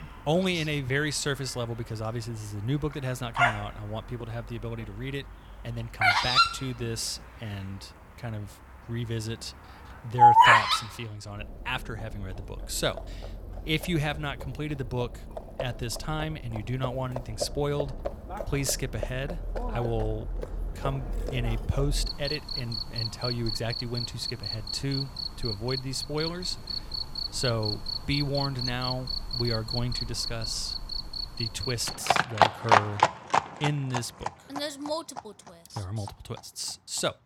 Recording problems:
animal sounds; very loud; throughout; 5 dB above the speech

